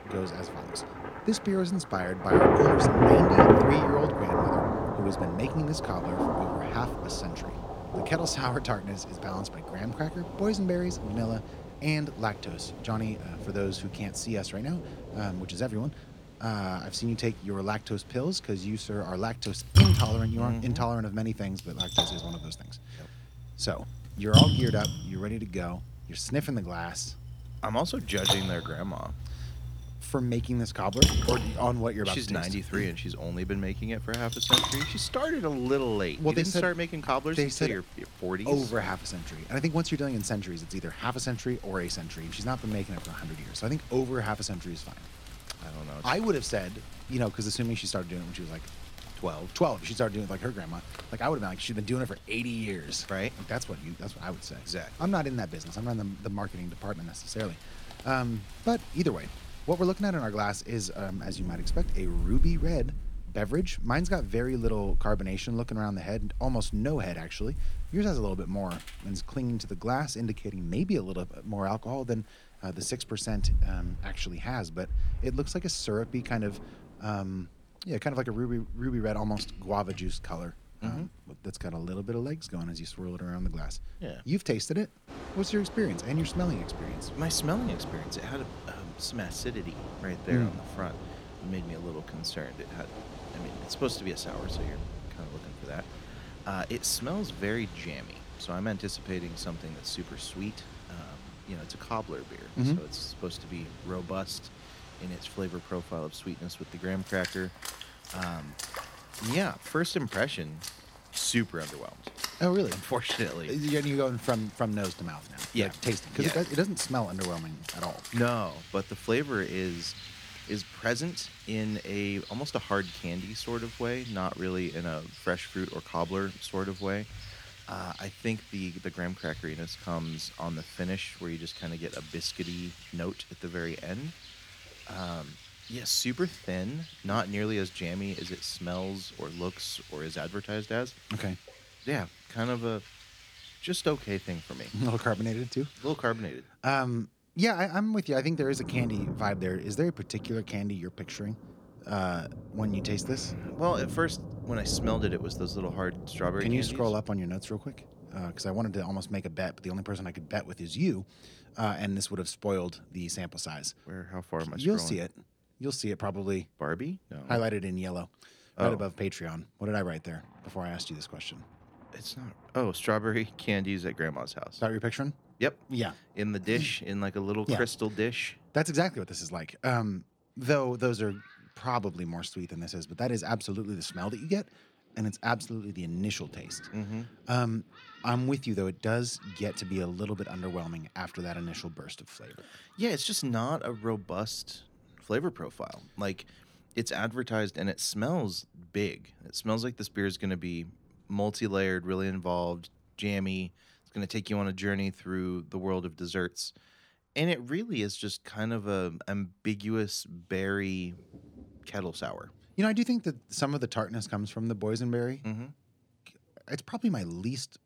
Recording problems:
rain or running water; loud; throughout; as loud as the speech

